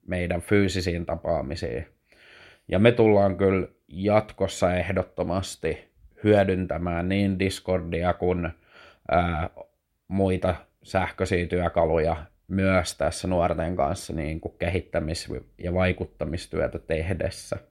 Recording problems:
none

